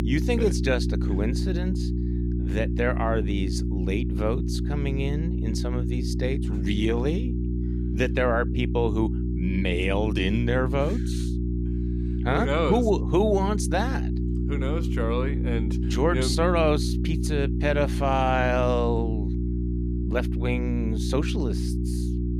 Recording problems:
electrical hum; loud; throughout; 60 Hz, 9 dB below the speech

